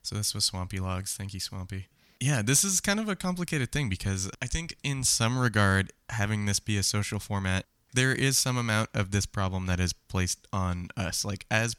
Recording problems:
none

